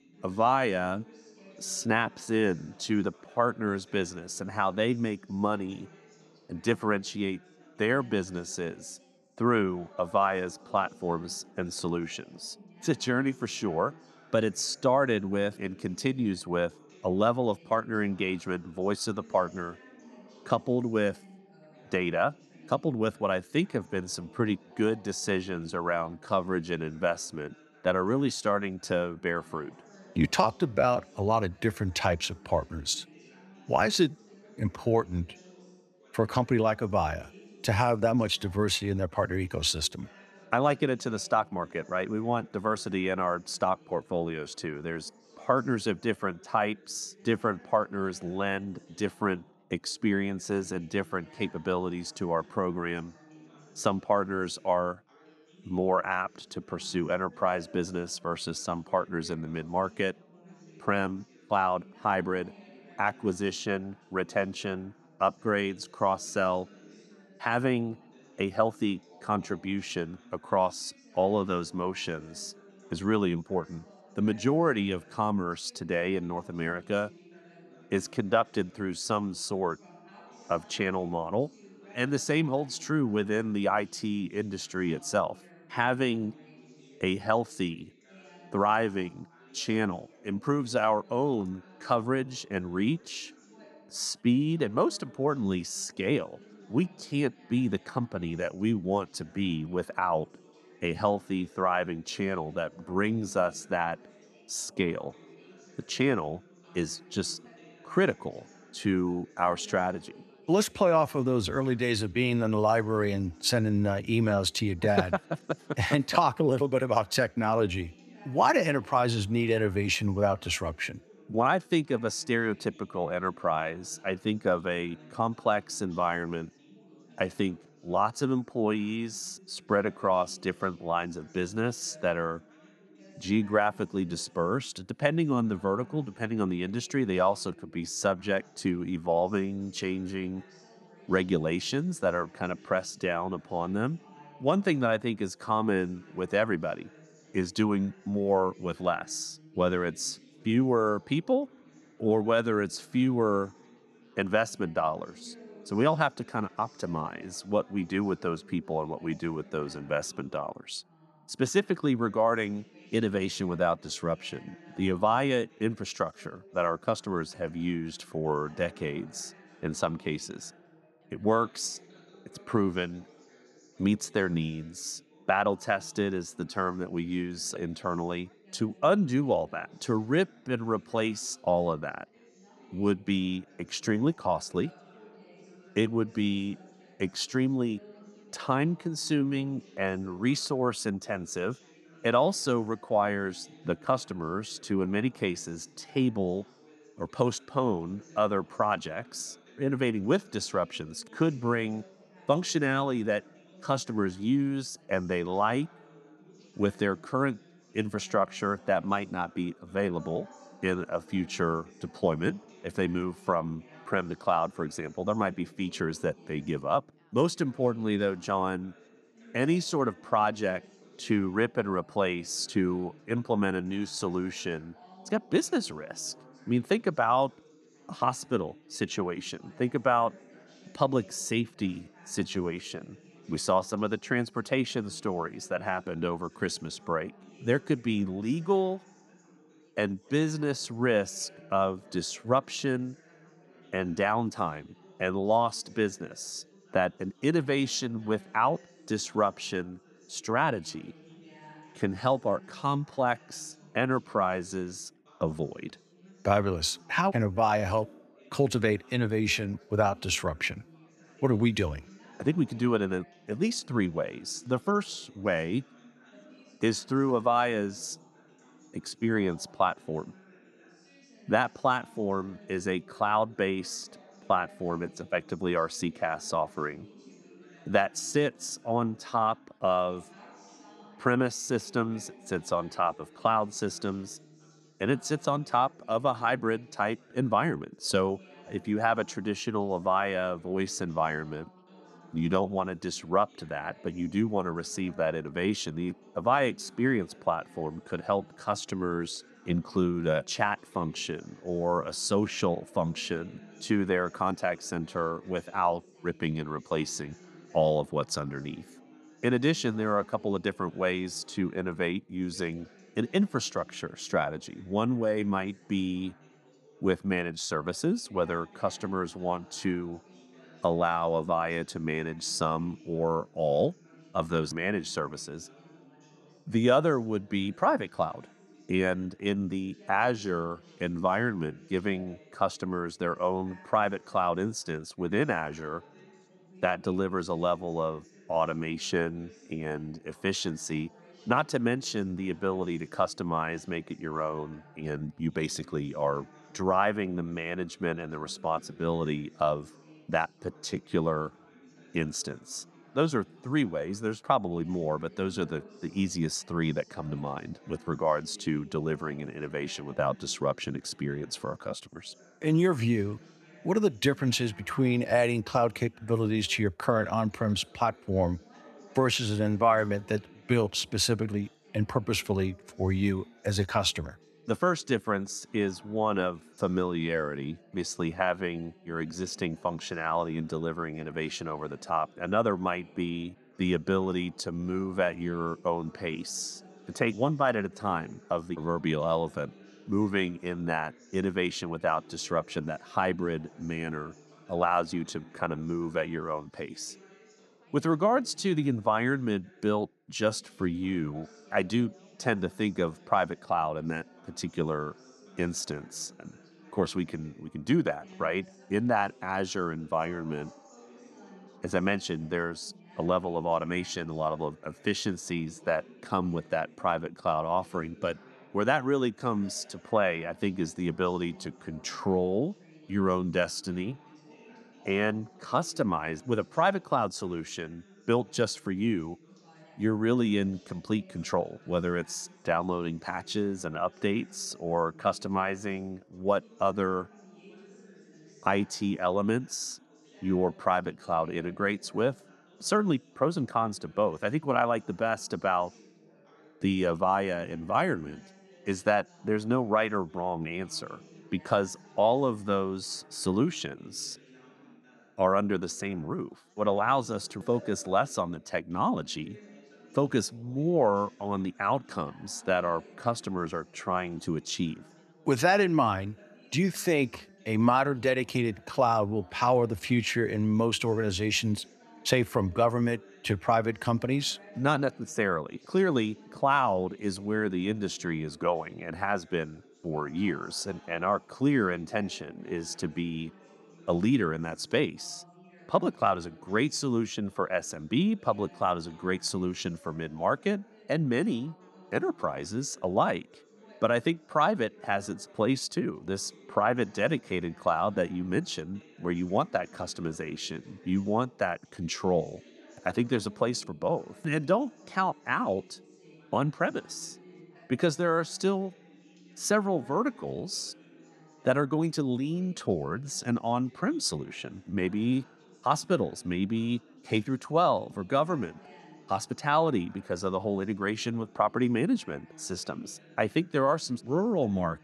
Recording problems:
background chatter; faint; throughout; 3 voices, 25 dB below the speech

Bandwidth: 13.5 kHz